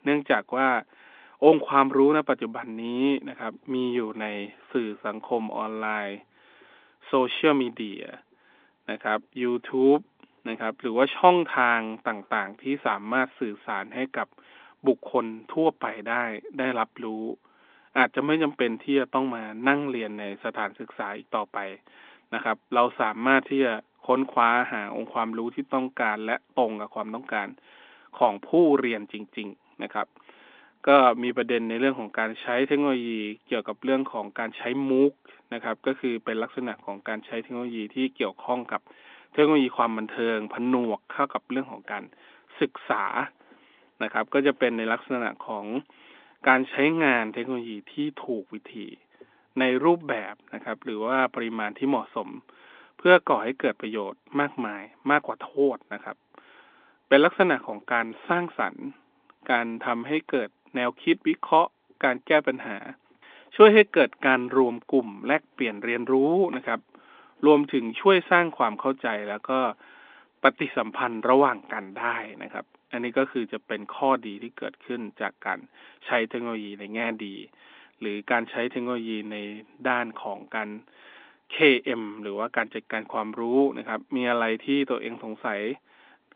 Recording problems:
phone-call audio; nothing above 3.5 kHz

